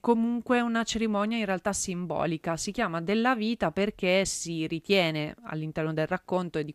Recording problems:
none

